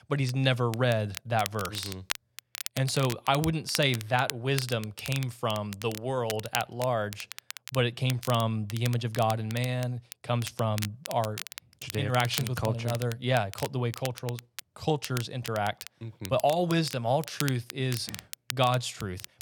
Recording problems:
crackle, like an old record; noticeable; 10 dB below the speech

